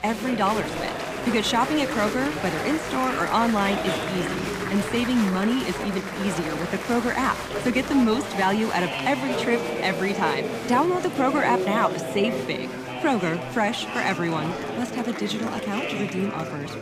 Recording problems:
chatter from many people; loud; throughout; 4 dB below the speech

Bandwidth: 15 kHz